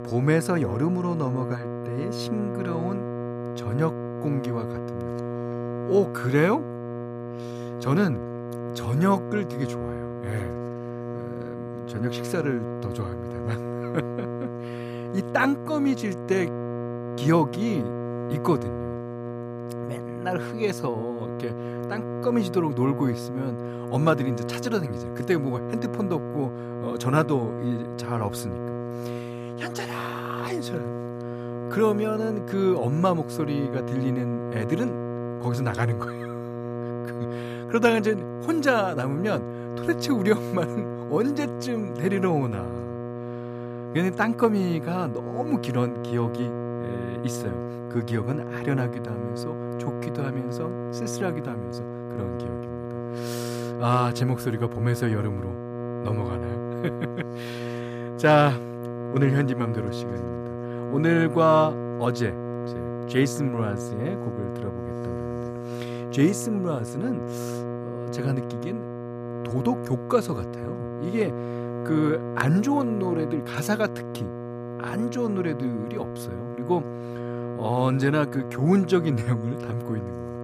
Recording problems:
electrical hum; loud; throughout; 60 Hz, 7 dB below the speech

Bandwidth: 14.5 kHz